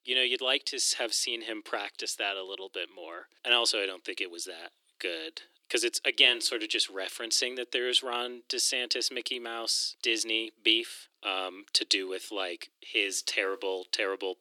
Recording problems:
thin; very; fading below 350 Hz

